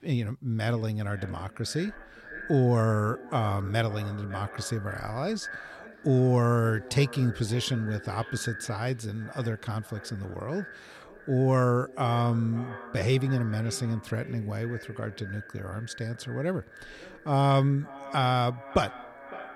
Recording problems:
echo of what is said; noticeable; throughout; 560 ms later, 15 dB below the speech

